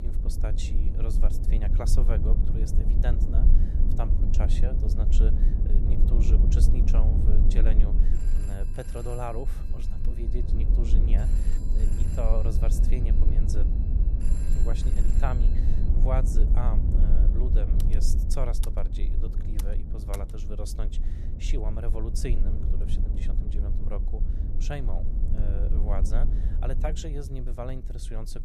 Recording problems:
low rumble; loud; throughout; 4 dB below the speech
electrical hum; faint; throughout; 60 Hz, 25 dB below the speech
phone ringing; noticeable; from 8 to 16 s; peak 8 dB below the speech
keyboard typing; noticeable; from 18 to 20 s; peak 7 dB below the speech

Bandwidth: 14 kHz